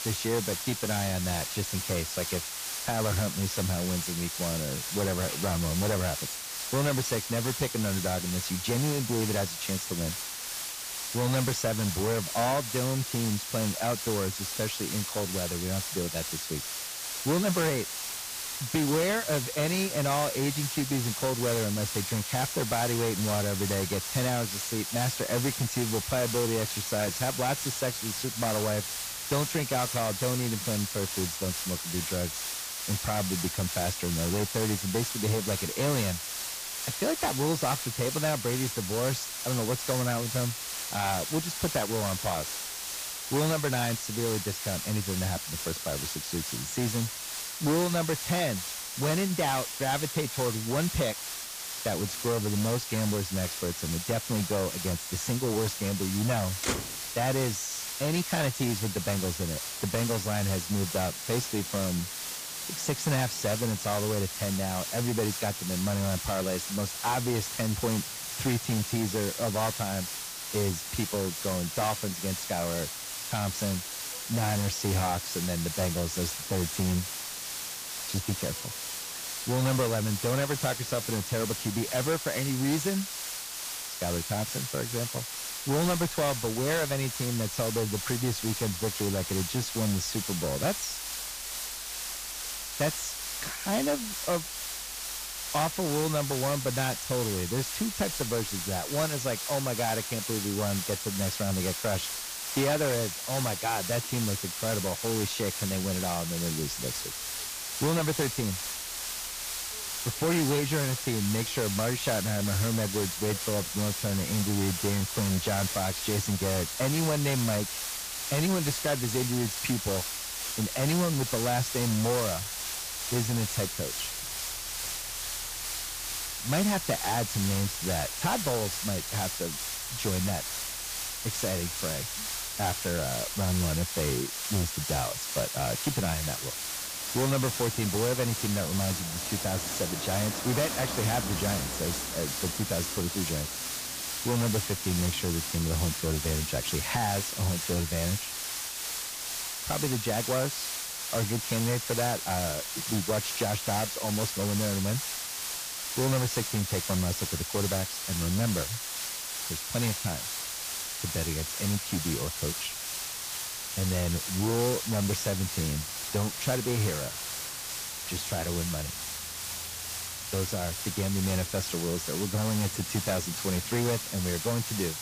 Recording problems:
distortion; slight; 6% of the sound clipped
garbled, watery; slightly; nothing above 8 kHz
hiss; loud; throughout; 2 dB below the speech
traffic noise; noticeable; throughout; 20 dB below the speech

